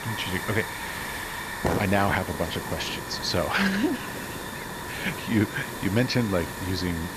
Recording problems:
high frequencies cut off; noticeable; nothing above 8 kHz
hiss; loud; throughout; 6 dB below the speech

